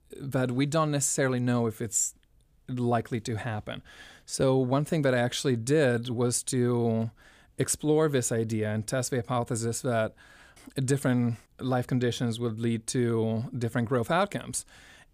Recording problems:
none

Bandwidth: 15 kHz